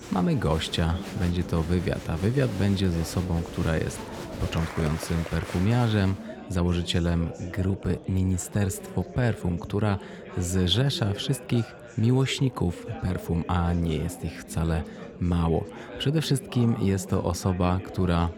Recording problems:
chatter from many people; noticeable; throughout; 10 dB below the speech

